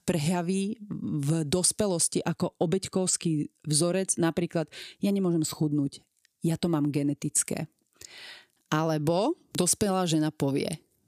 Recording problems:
none

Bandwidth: 15 kHz